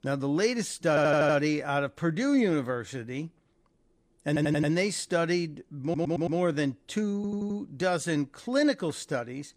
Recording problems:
audio stuttering; 4 times, first at 1 s

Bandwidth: 15 kHz